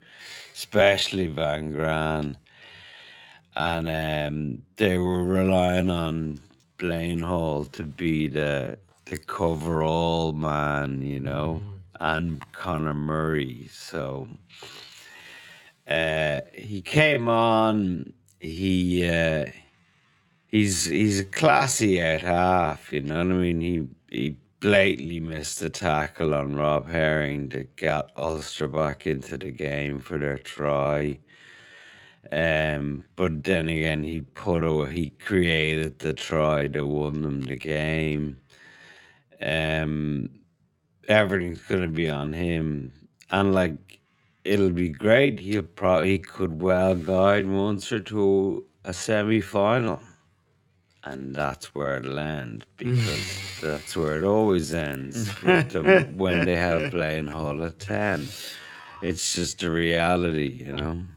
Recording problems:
wrong speed, natural pitch; too slow; 0.5 times normal speed

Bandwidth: 17.5 kHz